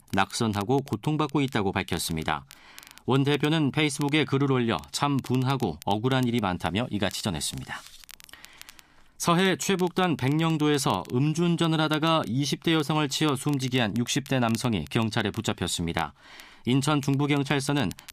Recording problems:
crackle, like an old record; faint; 25 dB below the speech

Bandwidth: 14.5 kHz